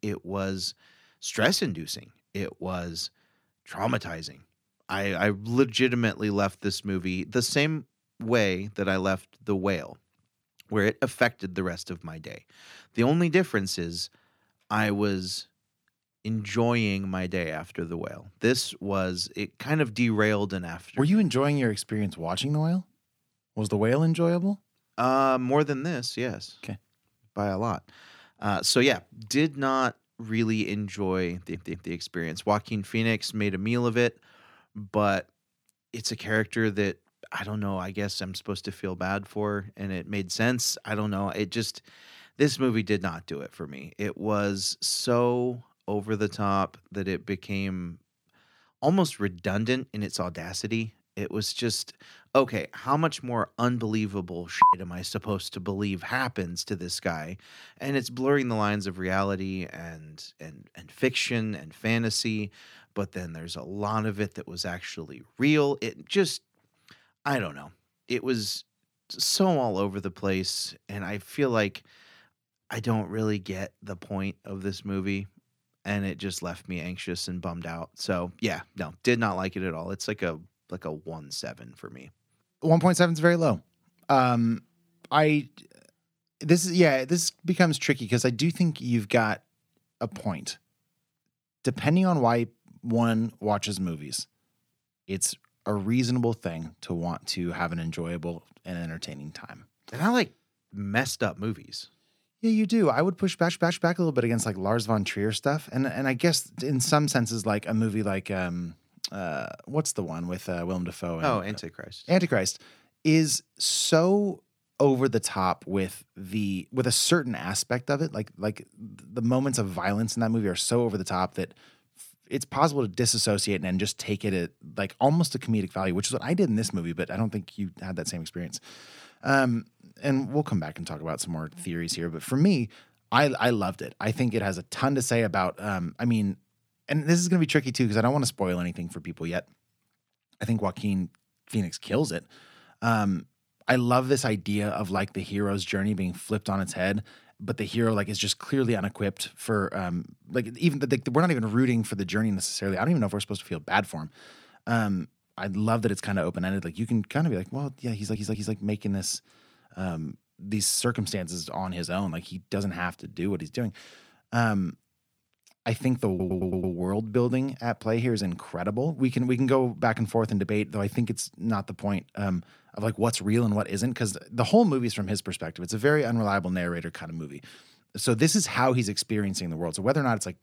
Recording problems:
audio stuttering; 4 times, first at 31 s

